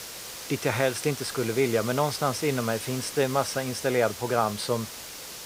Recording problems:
hiss; loud; throughout; 9 dB below the speech

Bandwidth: 15.5 kHz